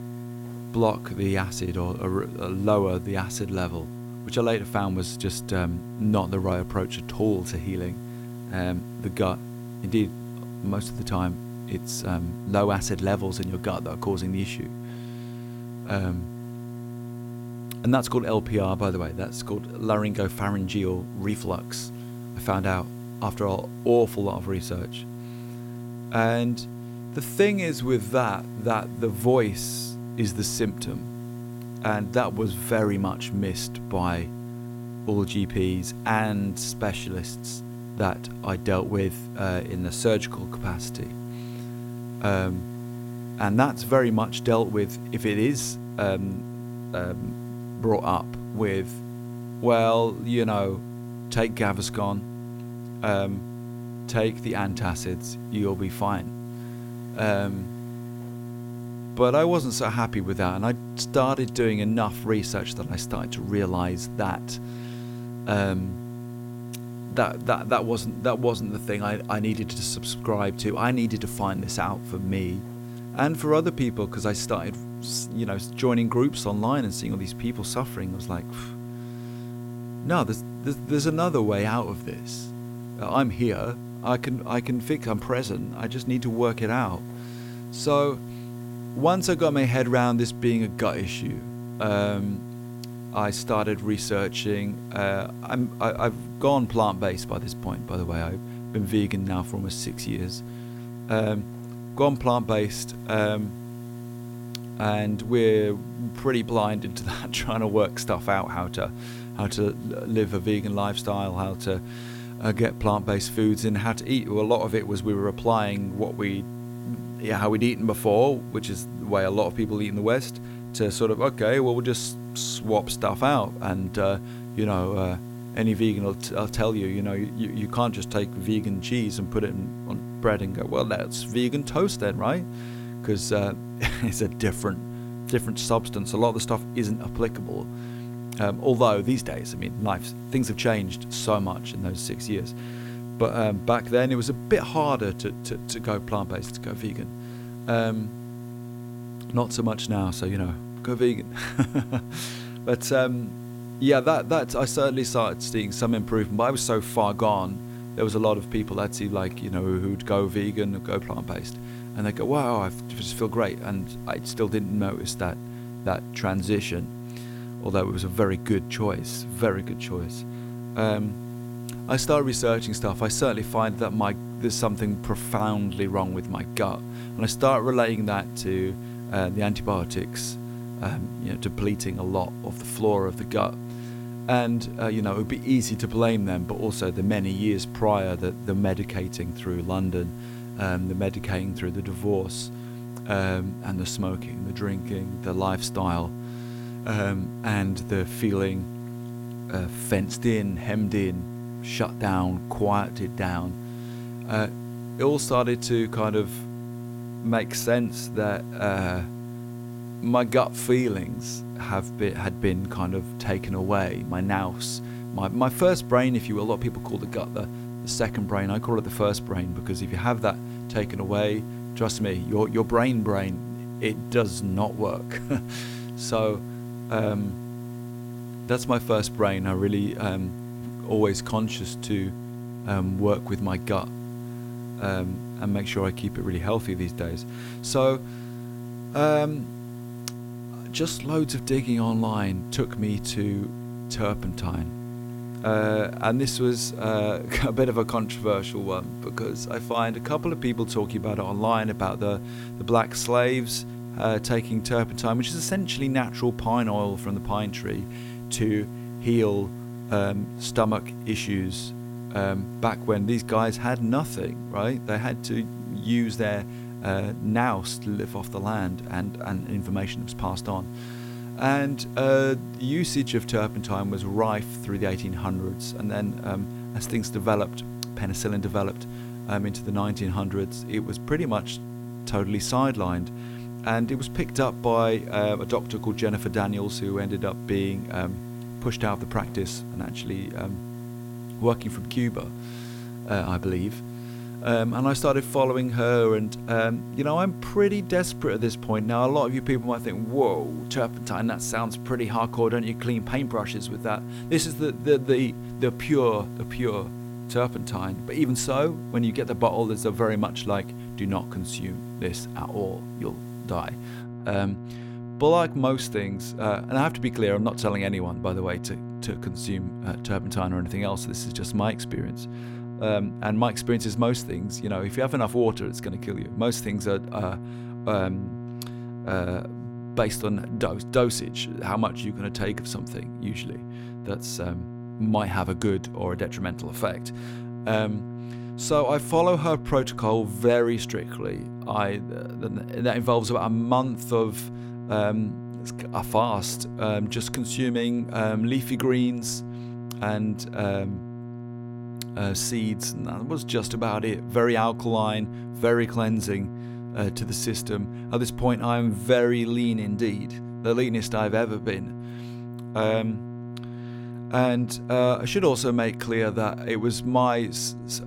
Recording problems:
electrical hum; noticeable; throughout; 60 Hz, 15 dB below the speech
hiss; faint; until 5:14; 25 dB below the speech

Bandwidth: 16.5 kHz